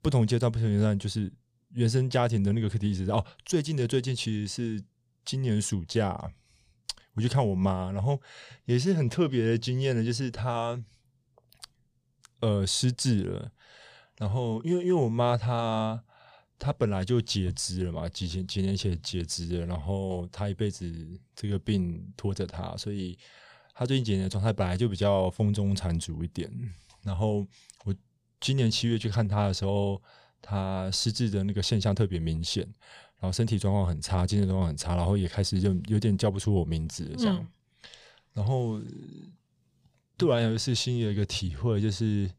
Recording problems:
none

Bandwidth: 15 kHz